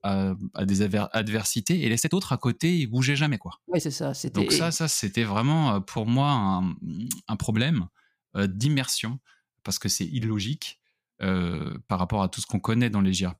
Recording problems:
uneven, jittery; strongly; from 0.5 to 12 s

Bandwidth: 15 kHz